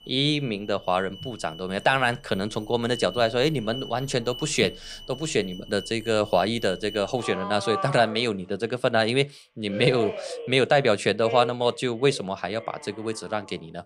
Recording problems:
alarms or sirens; noticeable; throughout; 15 dB below the speech

